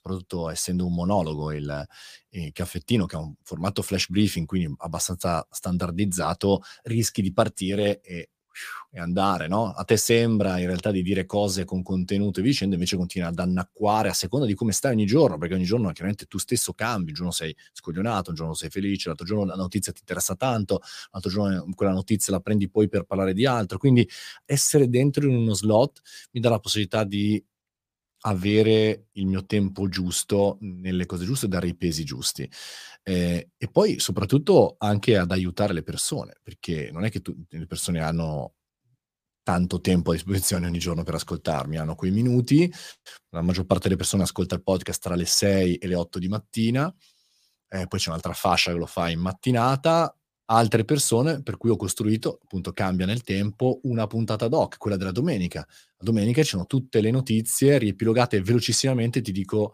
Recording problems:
none

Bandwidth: 15 kHz